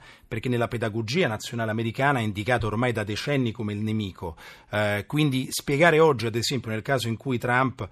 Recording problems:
none

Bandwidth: 14 kHz